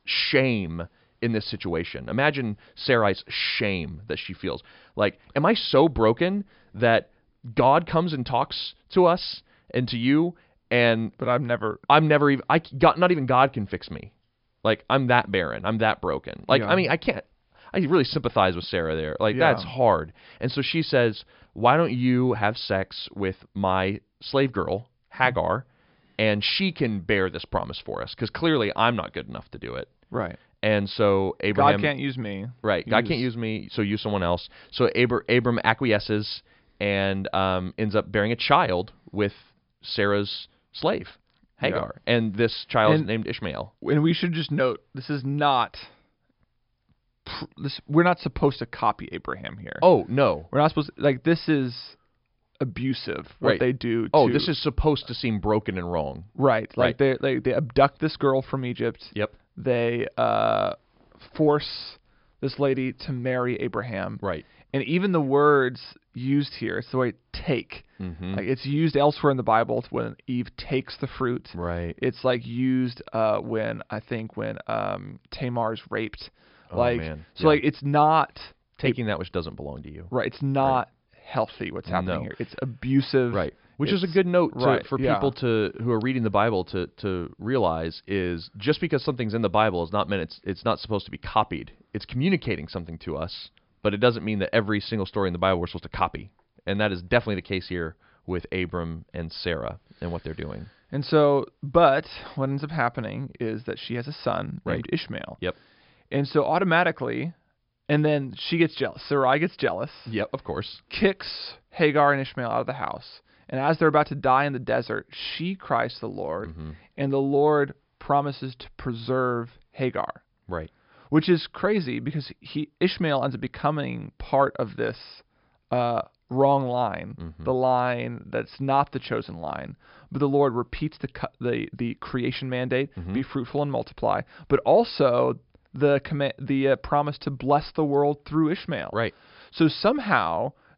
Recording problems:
high frequencies cut off; noticeable; nothing above 5.5 kHz

